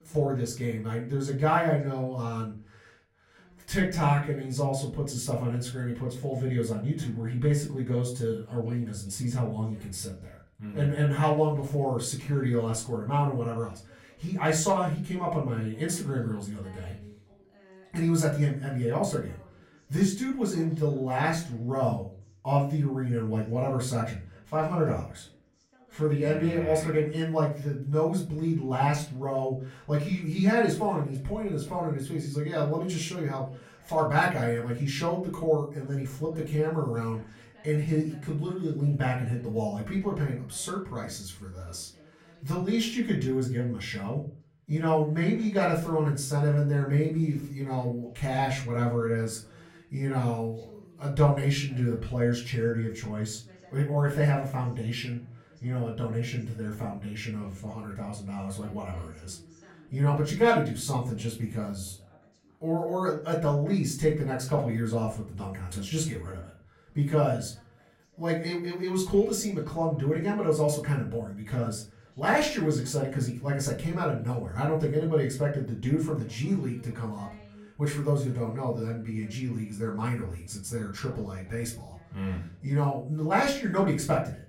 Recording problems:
off-mic speech; far
room echo; slight; dies away in 0.4 s
voice in the background; faint; throughout; 30 dB below the speech

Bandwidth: 16.5 kHz